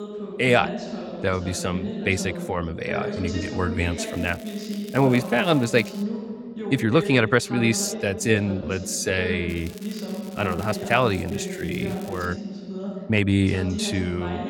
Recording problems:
voice in the background; loud; throughout; 8 dB below the speech
crackling; faint; from 4 to 6 s and from 9.5 to 12 s; 20 dB below the speech
uneven, jittery; strongly; from 1 to 13 s

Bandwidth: 17 kHz